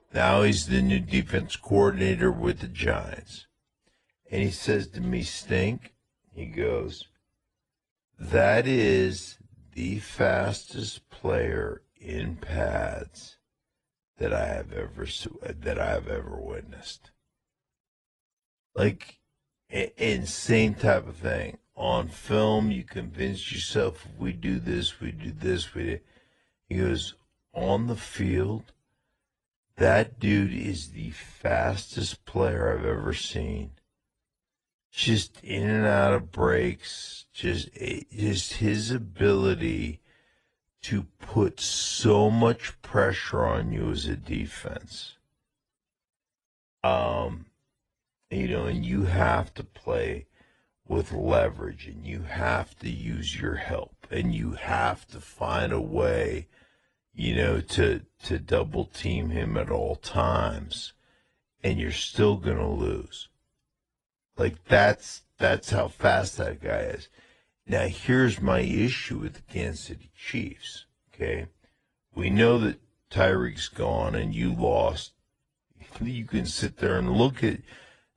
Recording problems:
wrong speed, natural pitch; too slow; 0.7 times normal speed
garbled, watery; slightly

